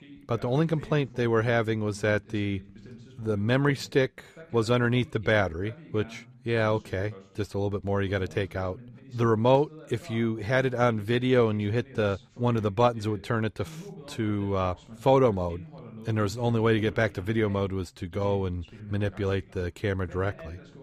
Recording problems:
voice in the background; noticeable; throughout; 20 dB below the speech

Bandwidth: 15 kHz